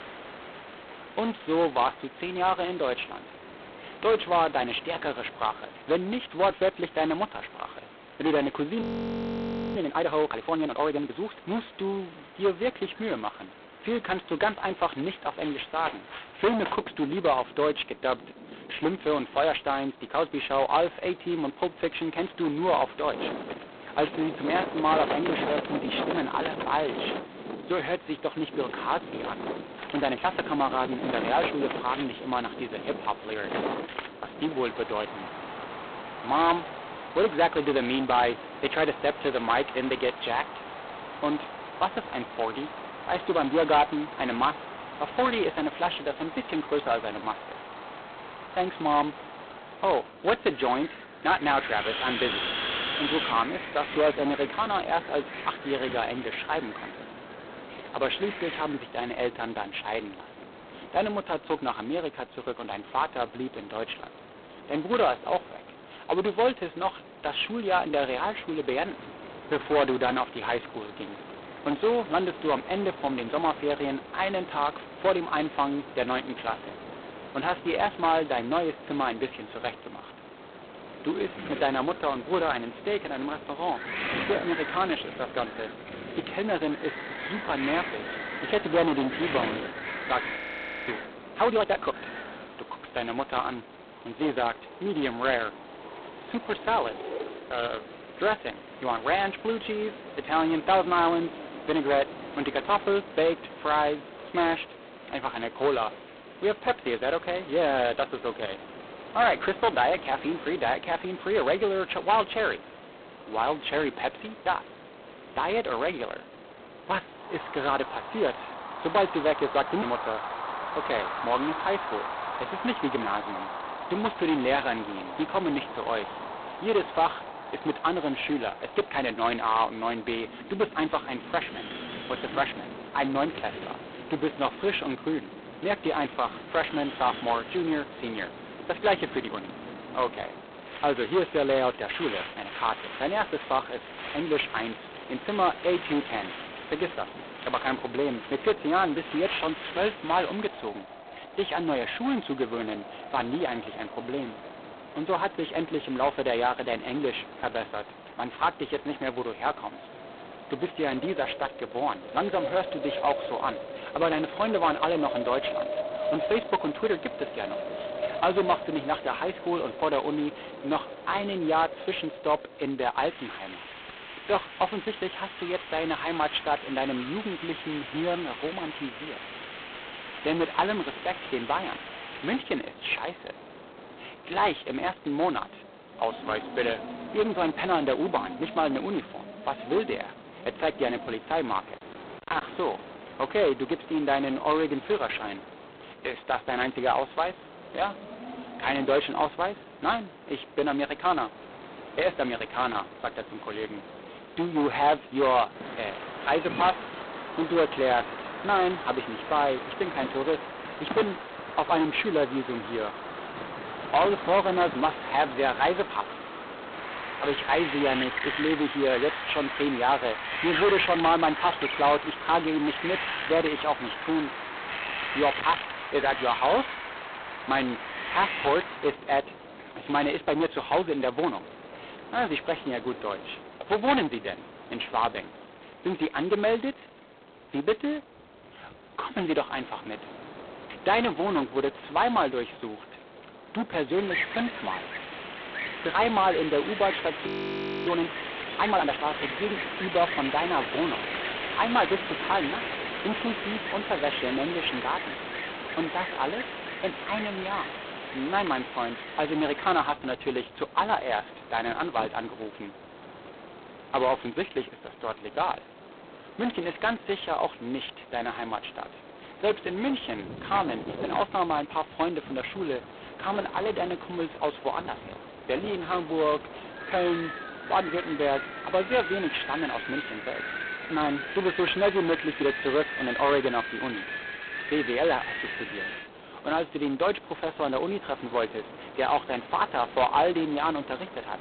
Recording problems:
phone-call audio; poor line; nothing above 4 kHz
distortion; slight; 4% of the sound clipped
wind in the background; loud; throughout; 9 dB below the speech
audio freezing; at 9 s for 1 s, at 1:30 for 0.5 s and at 4:07 for 0.5 s

